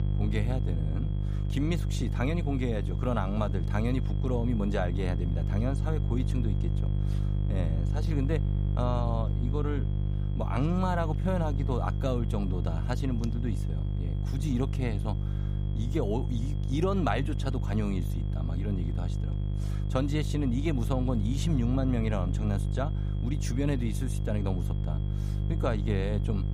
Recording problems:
electrical hum; loud; throughout; 50 Hz, 8 dB below the speech
high-pitched whine; faint; throughout; 3.5 kHz, 25 dB below the speech

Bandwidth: 15.5 kHz